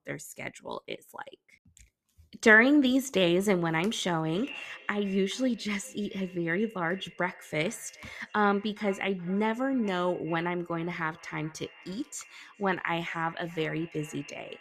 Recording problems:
echo of what is said; faint; from 4.5 s on; 420 ms later, 20 dB below the speech

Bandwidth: 14.5 kHz